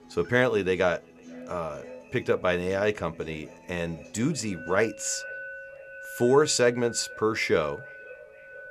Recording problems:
echo of what is said; faint; throughout; 490 ms later, 25 dB below the speech
background music; noticeable; throughout; 15 dB below the speech

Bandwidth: 13.5 kHz